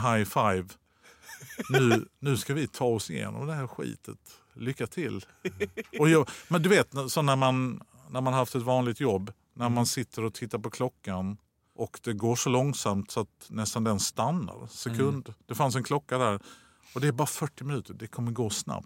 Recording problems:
abrupt cut into speech; at the start

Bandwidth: 16 kHz